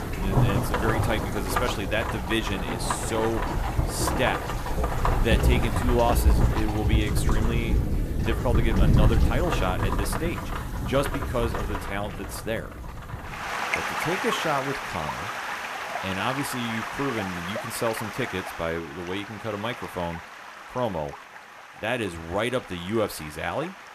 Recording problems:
rain or running water; very loud; throughout; 2 dB above the speech

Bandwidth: 14.5 kHz